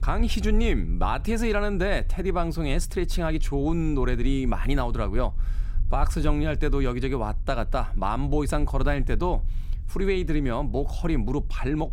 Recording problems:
low rumble; faint; throughout; 25 dB below the speech

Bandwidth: 16 kHz